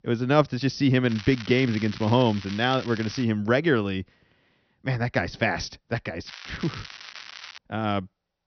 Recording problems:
high frequencies cut off; noticeable; nothing above 6 kHz
crackling; noticeable; from 1 to 3 s and from 6.5 to 7.5 s; 15 dB below the speech

